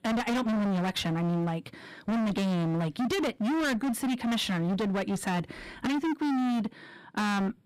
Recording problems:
distortion; heavy; 39% of the sound clipped

